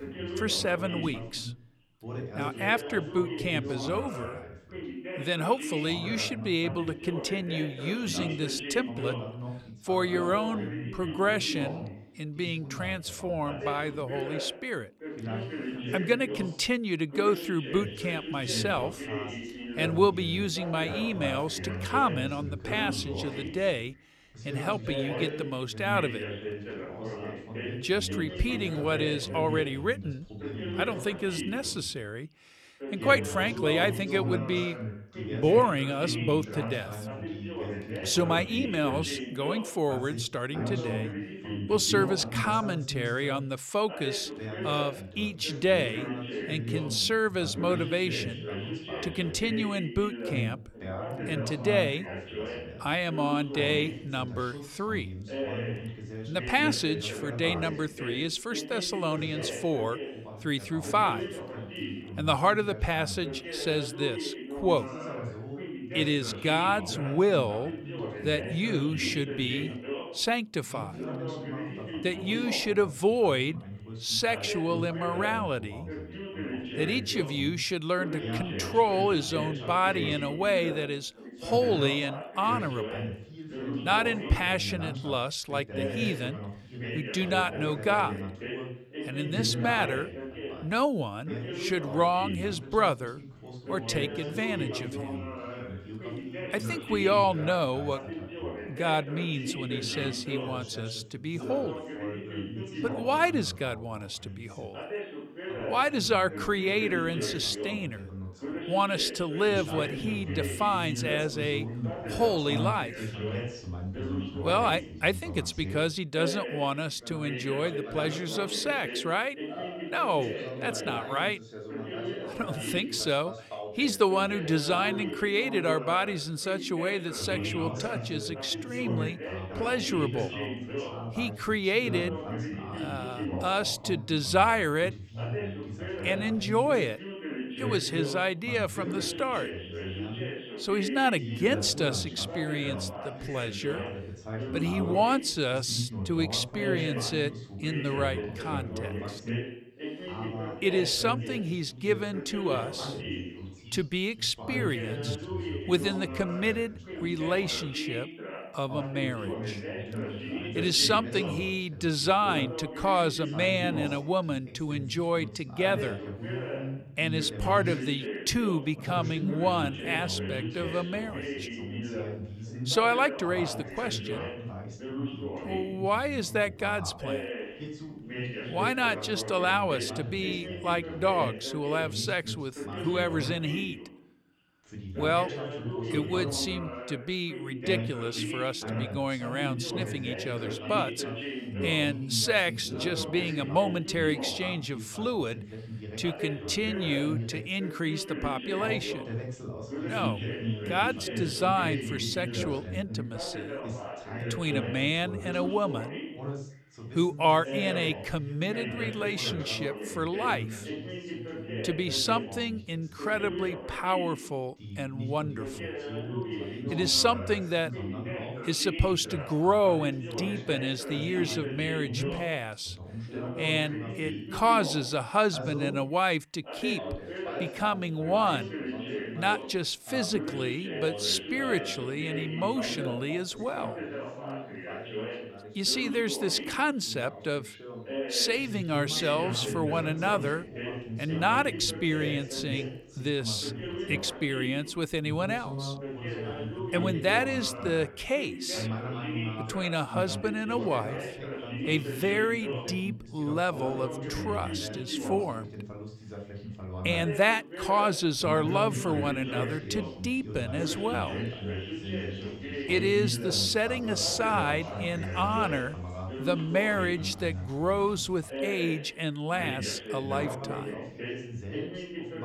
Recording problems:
background chatter; loud; throughout; 2 voices, 7 dB below the speech

